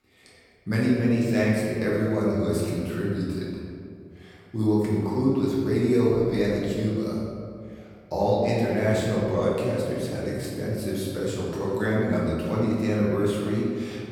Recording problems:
room echo; strong; dies away in 2 s
off-mic speech; far

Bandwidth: 18 kHz